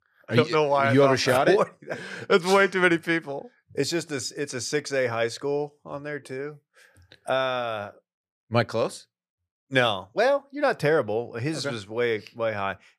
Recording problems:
none

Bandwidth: 15 kHz